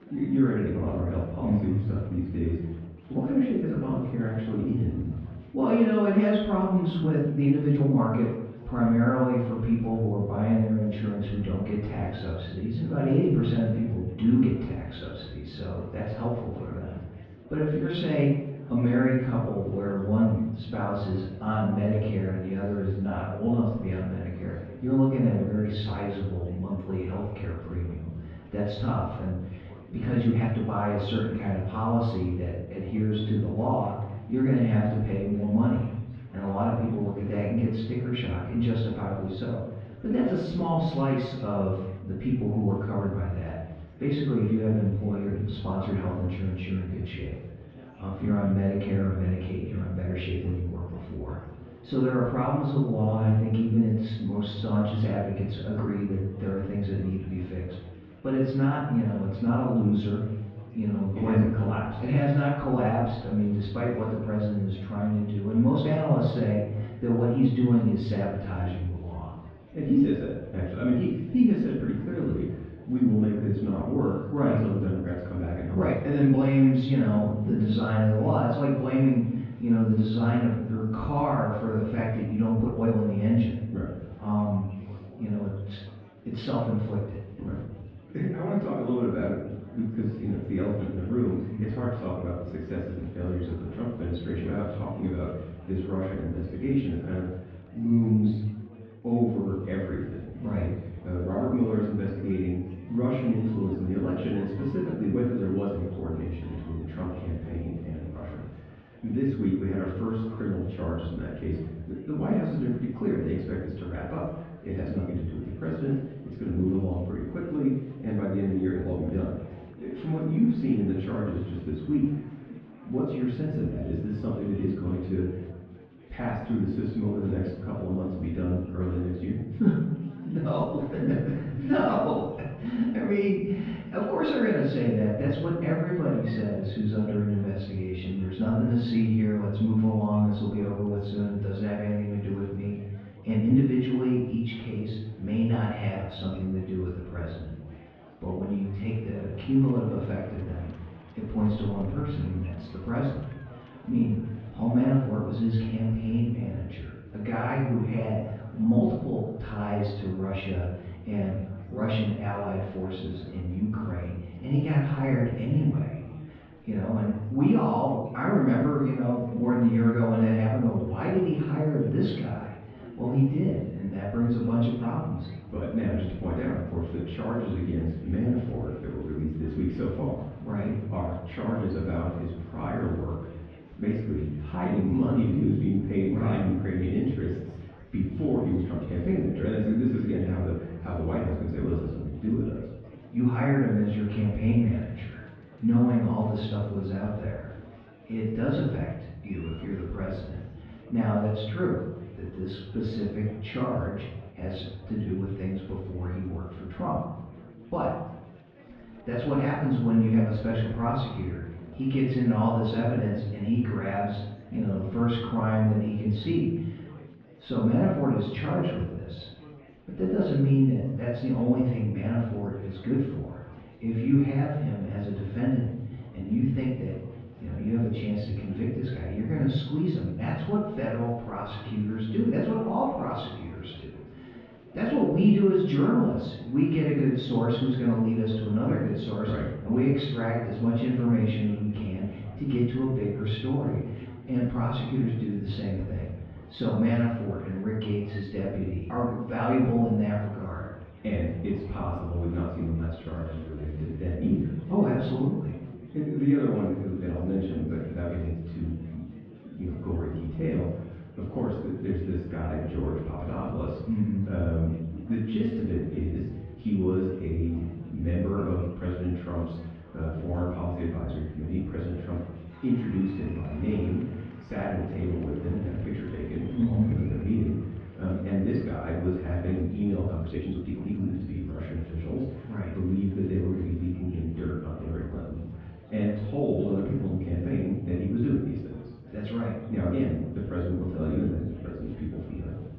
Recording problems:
off-mic speech; far
muffled; very; fading above 3.5 kHz
room echo; noticeable; dies away in 0.8 s
murmuring crowd; faint; throughout; 20 dB below the speech
uneven, jittery; strongly; from 7 s to 4:41

